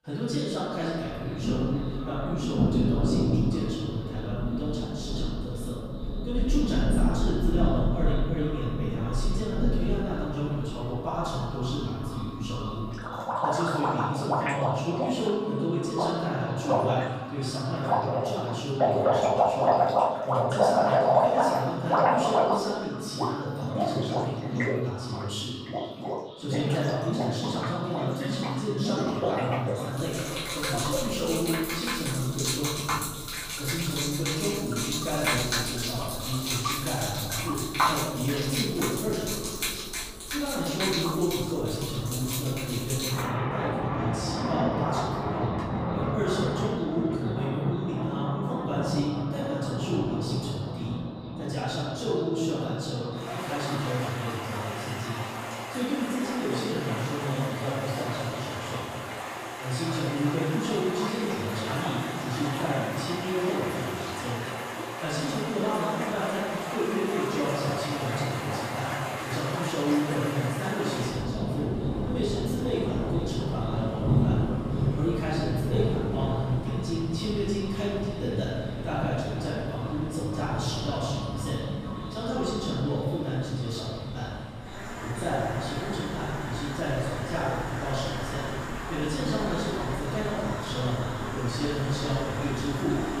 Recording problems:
room echo; strong; dies away in 1.6 s
off-mic speech; far
echo of what is said; noticeable; throughout; 480 ms later, 15 dB below the speech
rain or running water; very loud; throughout; as loud as the speech

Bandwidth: 15 kHz